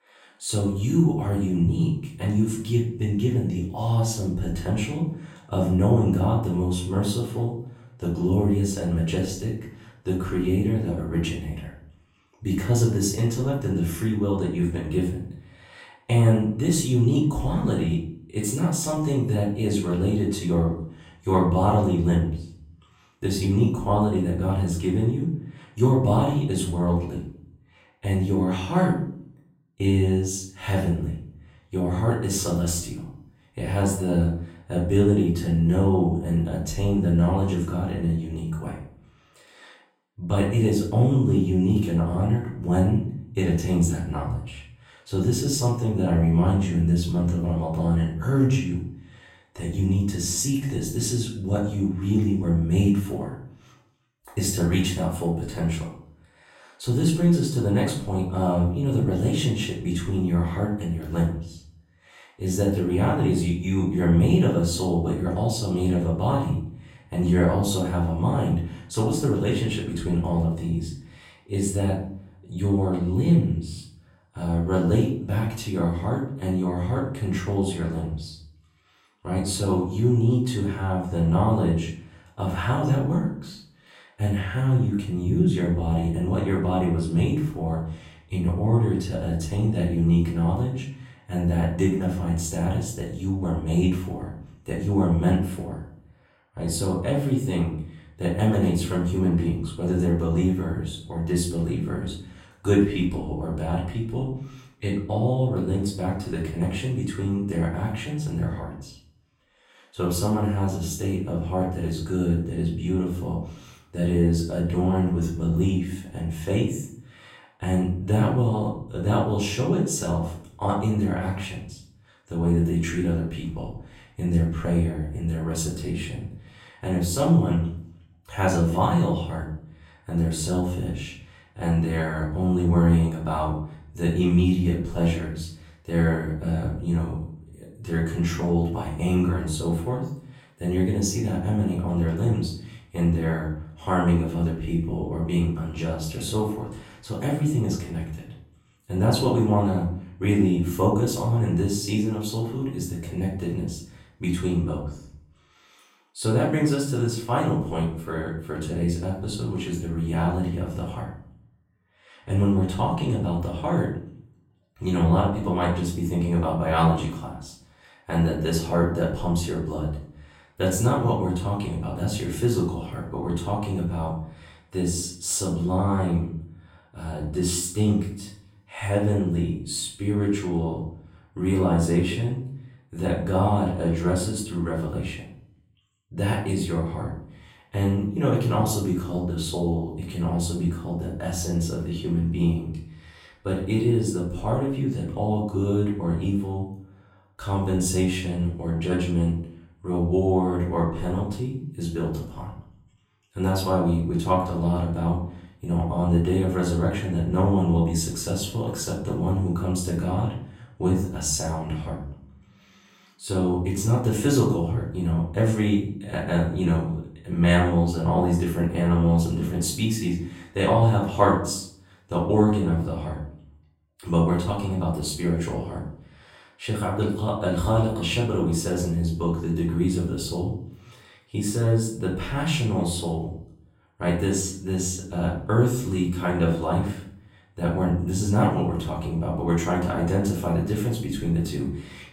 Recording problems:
off-mic speech; far
room echo; noticeable; dies away in 0.5 s

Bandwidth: 16 kHz